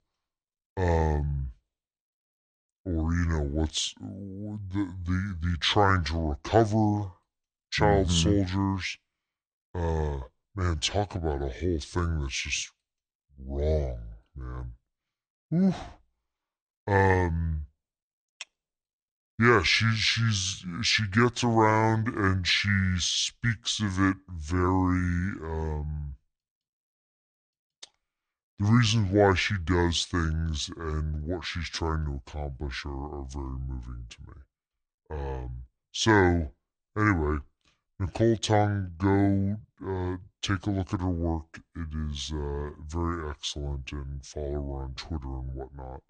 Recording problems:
wrong speed and pitch; too slow and too low; 0.7 times normal speed

